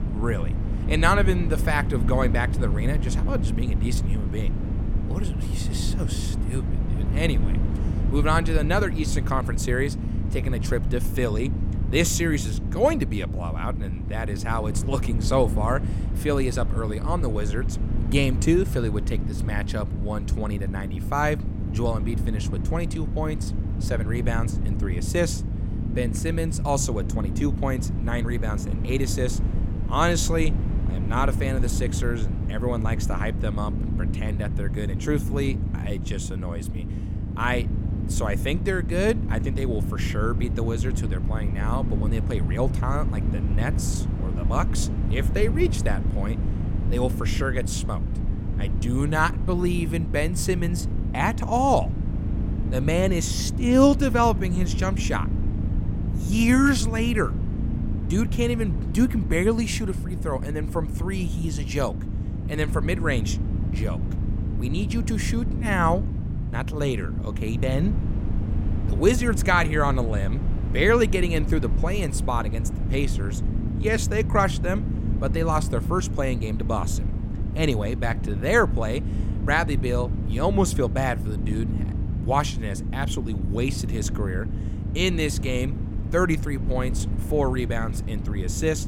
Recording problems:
low rumble; noticeable; throughout; 10 dB below the speech

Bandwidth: 16.5 kHz